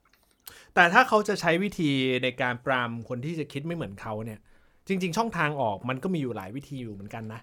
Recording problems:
none

